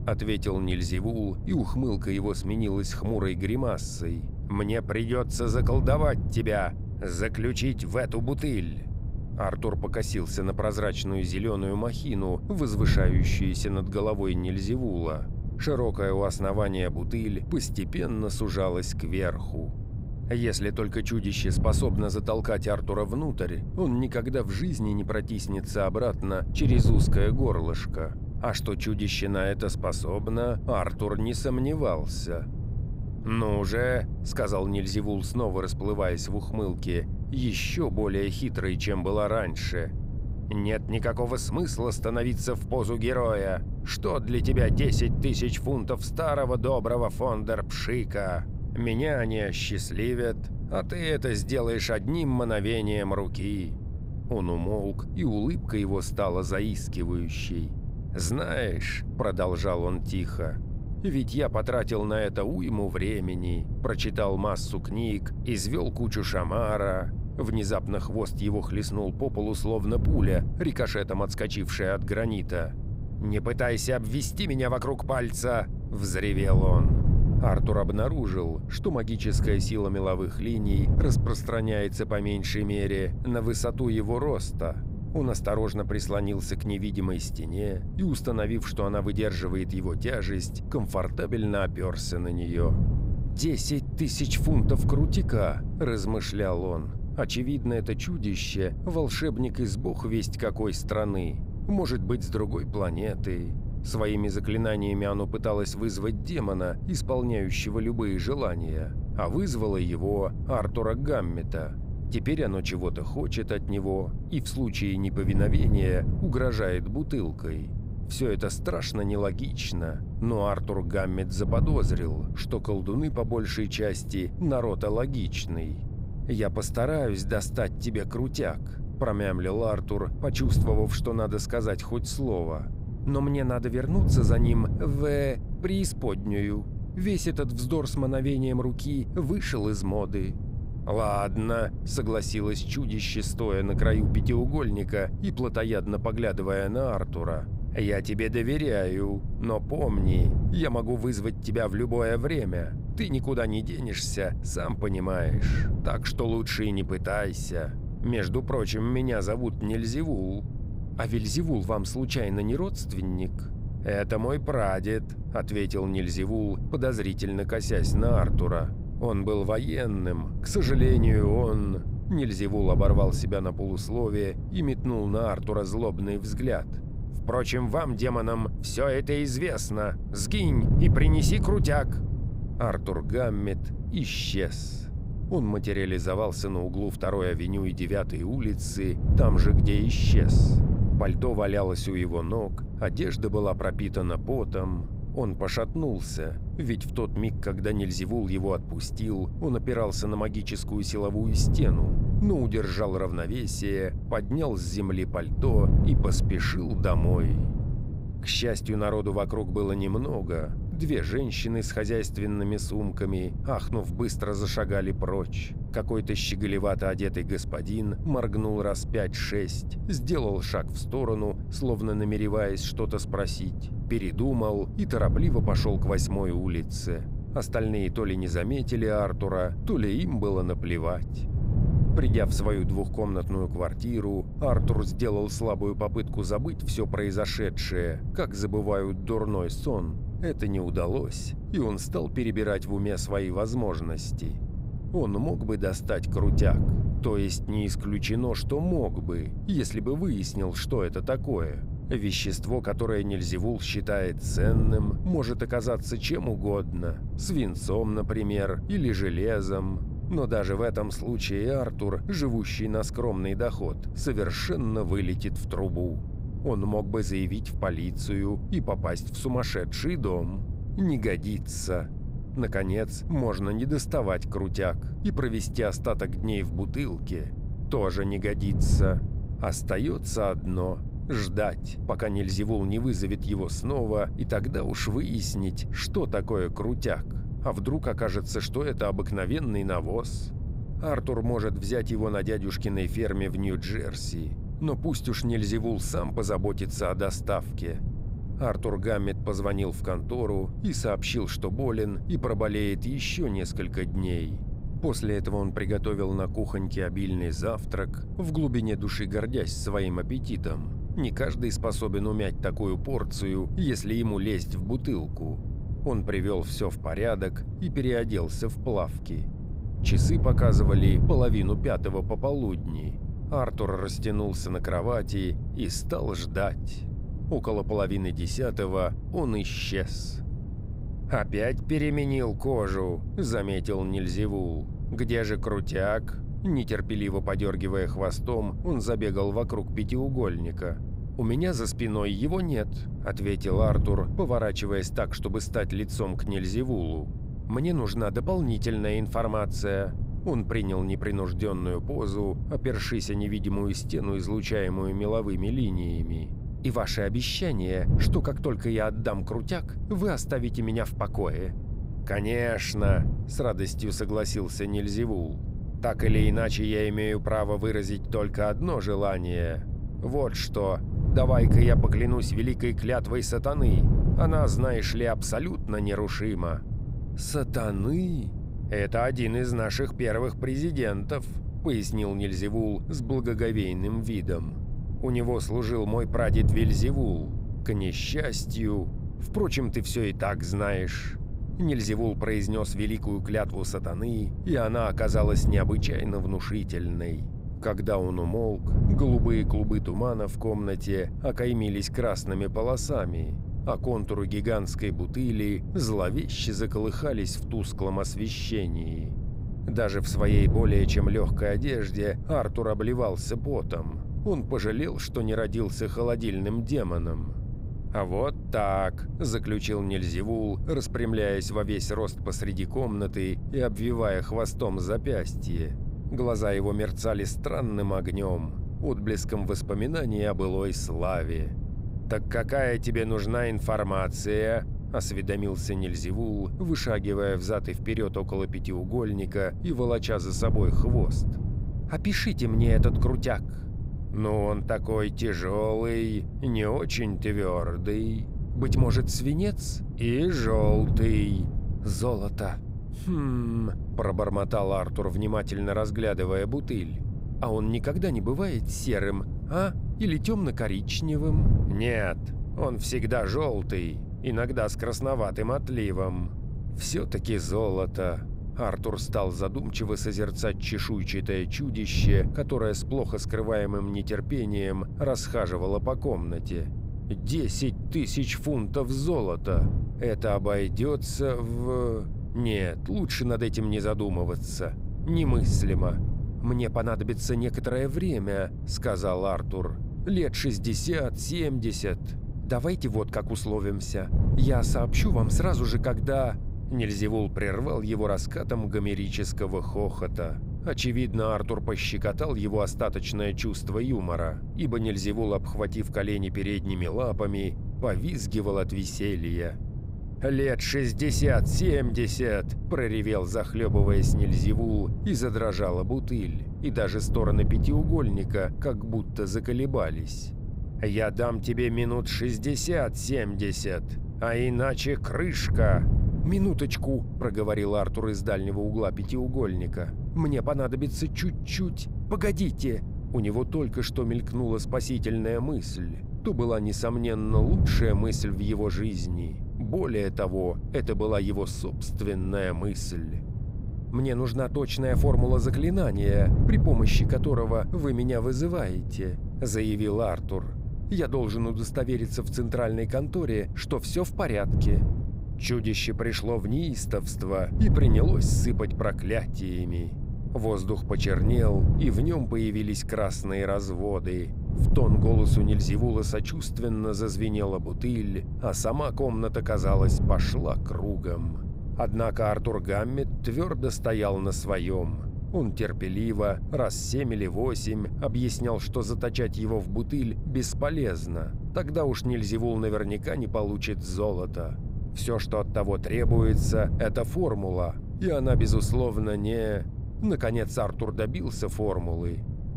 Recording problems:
wind noise on the microphone; occasional gusts; 10 dB below the speech

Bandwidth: 15.5 kHz